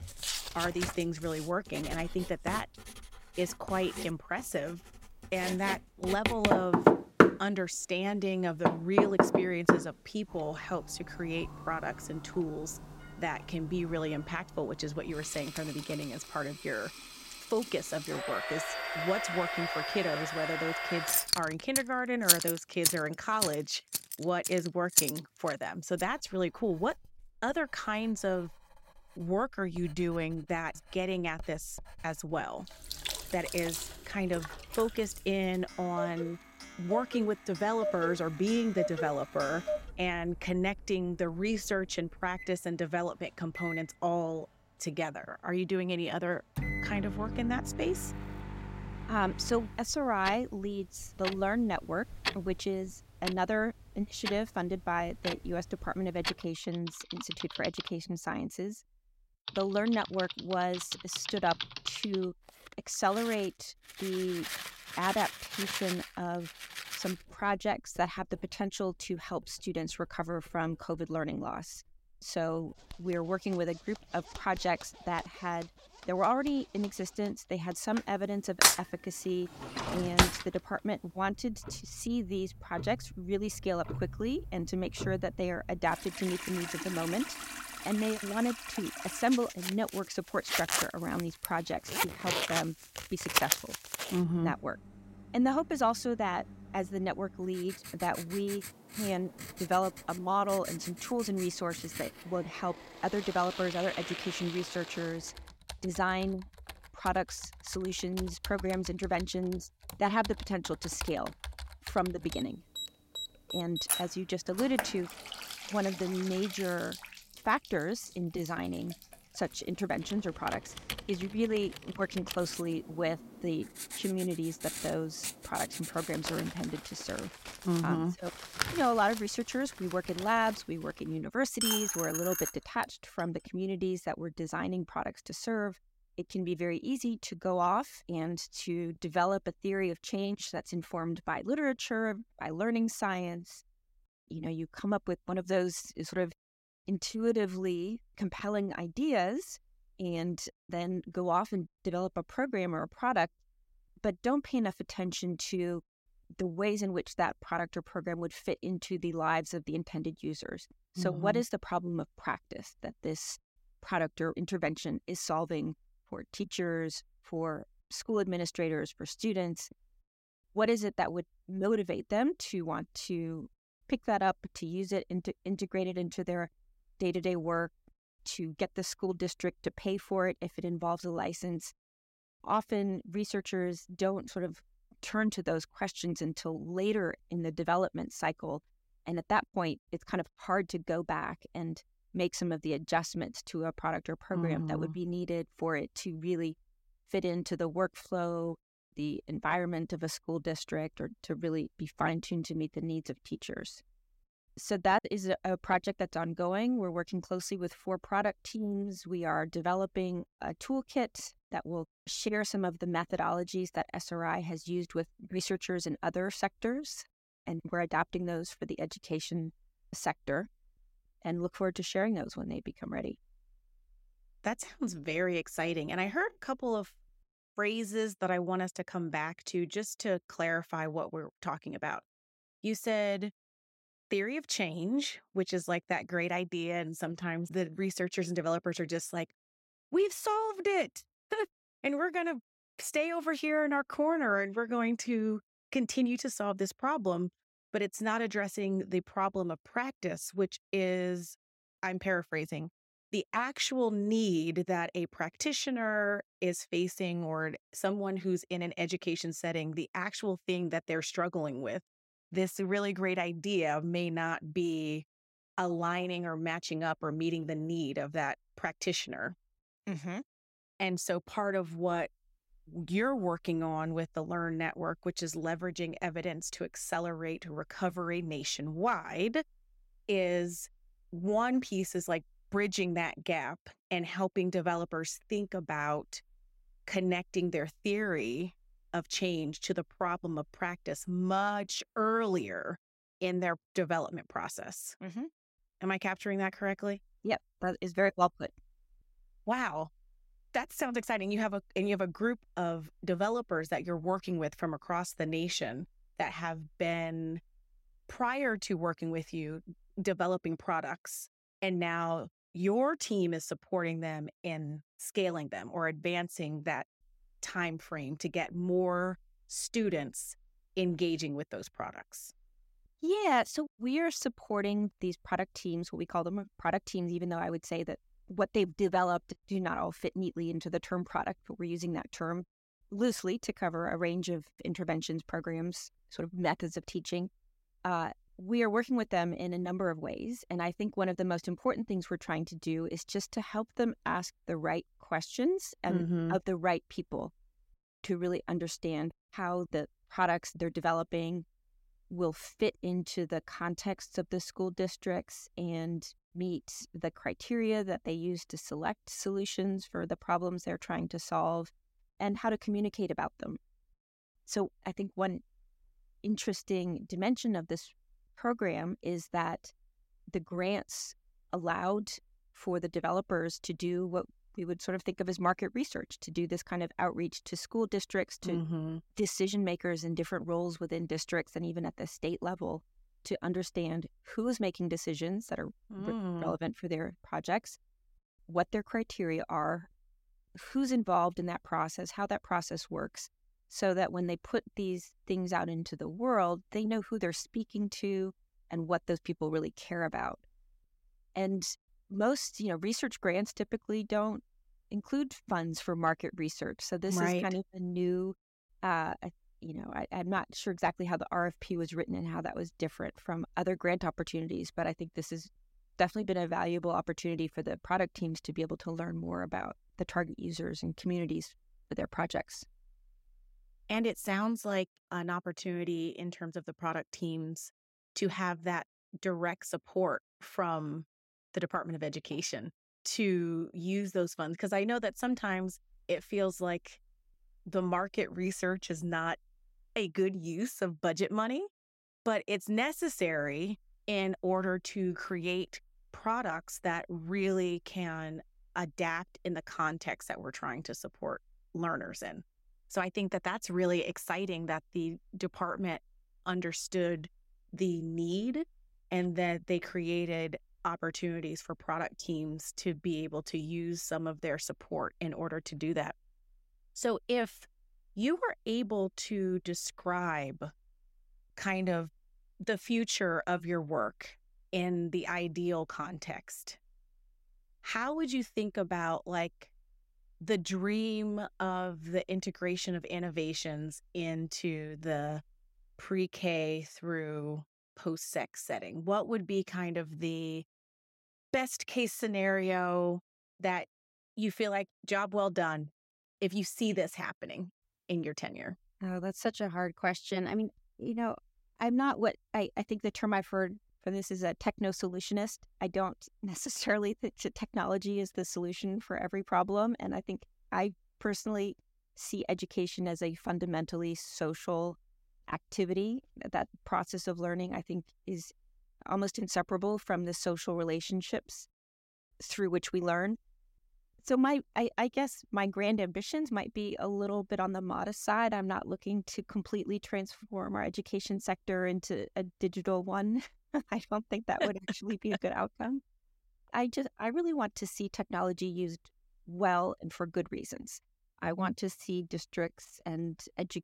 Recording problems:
household noises; loud; until 2:13; 1 dB below the speech

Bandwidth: 16 kHz